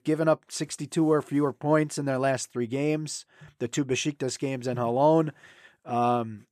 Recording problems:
none

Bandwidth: 14 kHz